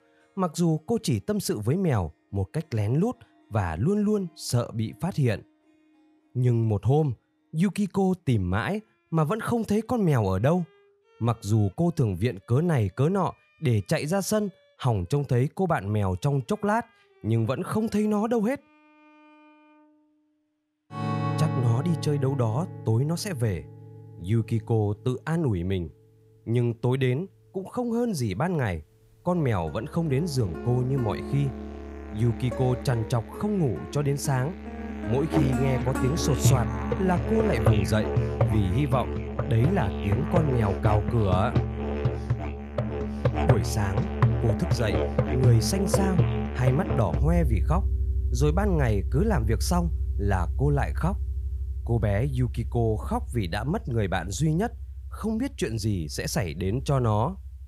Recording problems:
background music; loud; throughout; 3 dB below the speech

